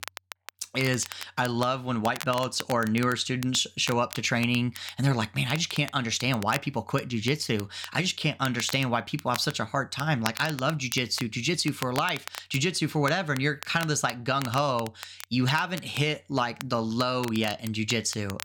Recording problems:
crackle, like an old record; noticeable; 15 dB below the speech

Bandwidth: 17 kHz